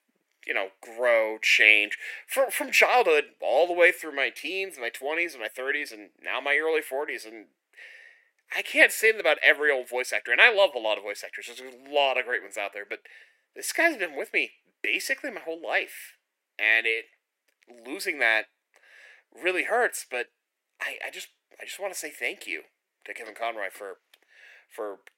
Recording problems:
thin; somewhat; fading below 350 Hz

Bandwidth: 16 kHz